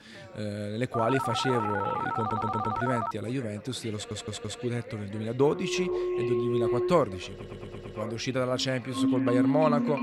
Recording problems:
echo of what is said; noticeable; throughout; 490 ms later, 20 dB below the speech
background music; very loud; from 5.5 s on; 1 dB above the speech
background chatter; noticeable; throughout; 3 voices, 20 dB below the speech
phone ringing; noticeable; from 1 to 3 s; peak level with the speech
audio stuttering; at 2 s, at 4 s and at 7.5 s

